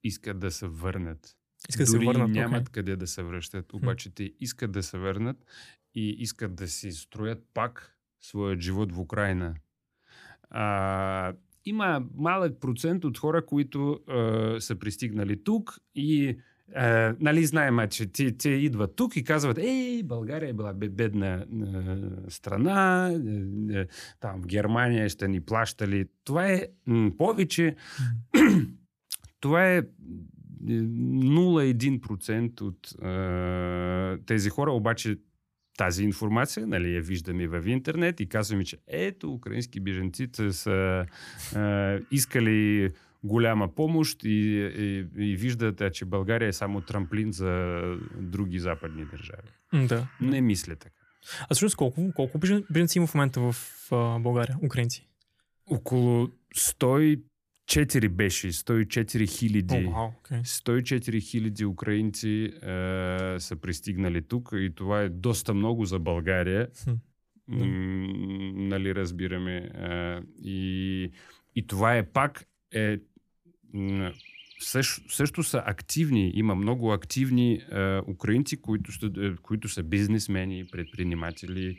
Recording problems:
animal sounds; faint; throughout; 30 dB below the speech

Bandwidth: 14.5 kHz